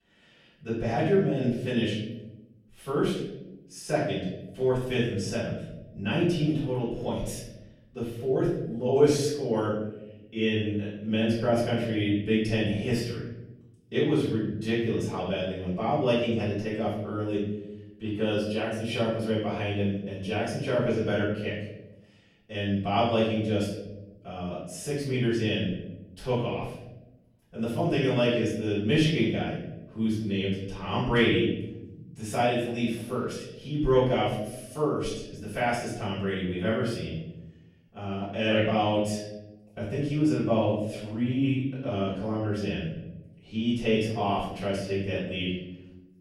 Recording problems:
off-mic speech; far
room echo; noticeable; dies away in 1 s

